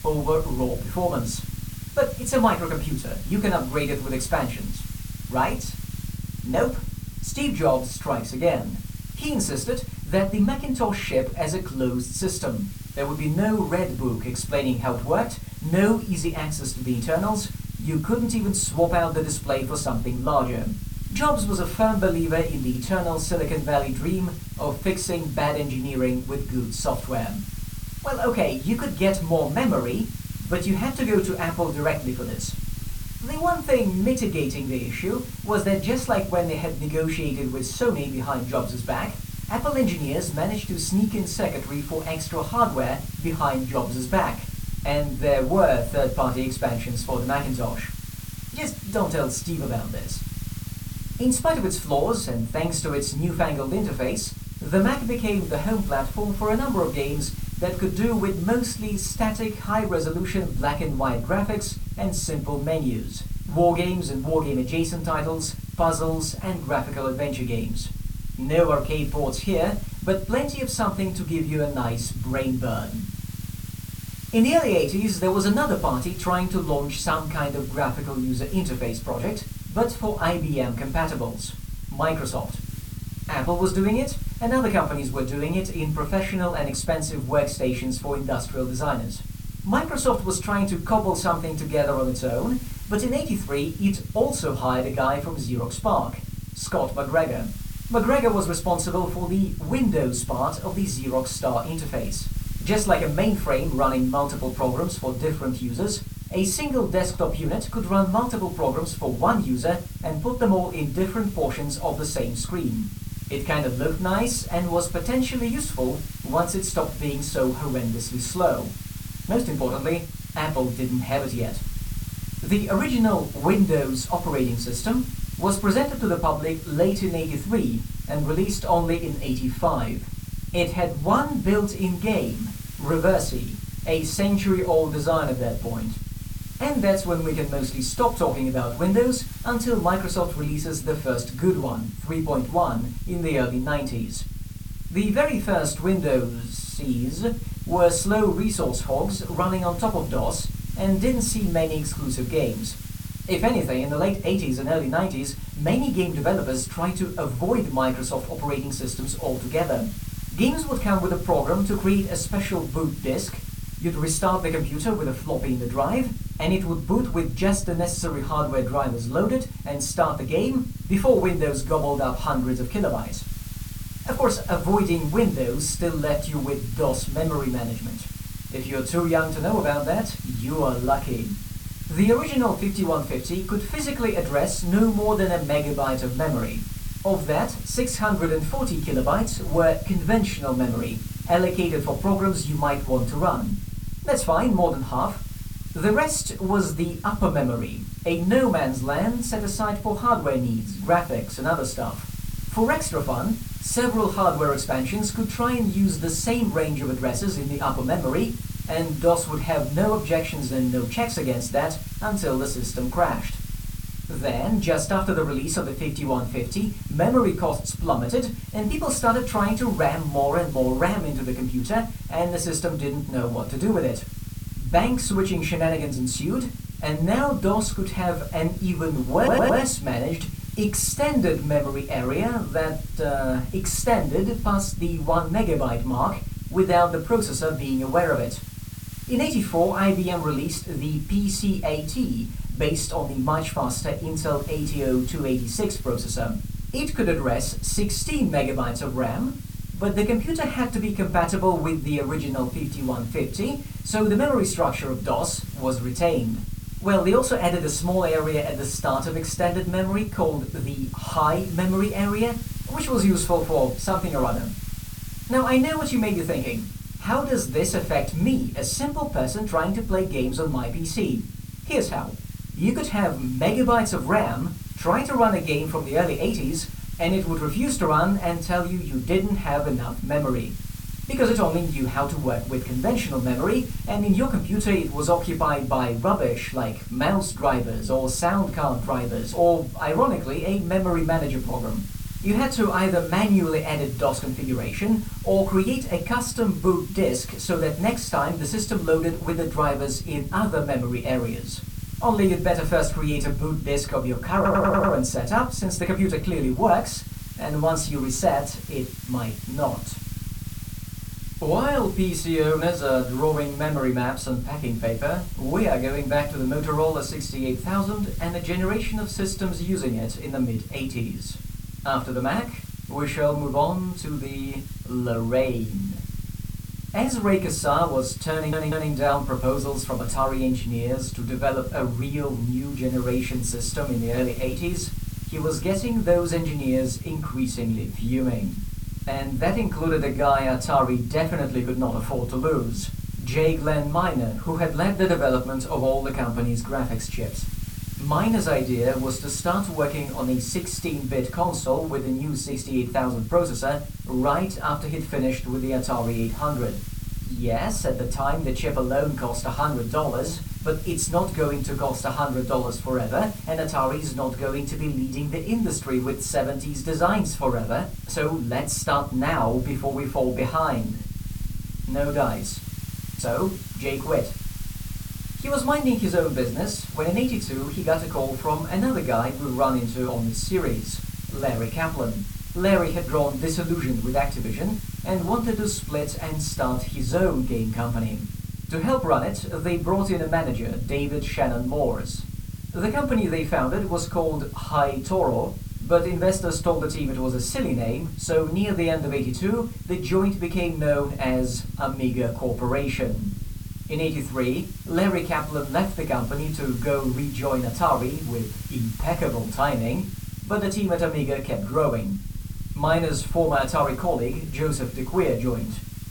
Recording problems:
off-mic speech; far
room echo; very slight; dies away in 0.2 s
hiss; noticeable; throughout; 20 dB below the speech
low rumble; faint; throughout; 20 dB below the speech
audio stuttering; at 3:49, at 5:04 and at 5:28

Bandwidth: 18 kHz